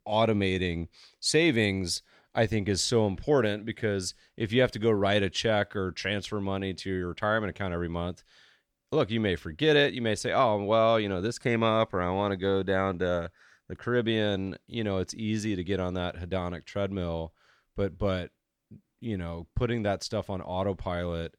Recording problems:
none

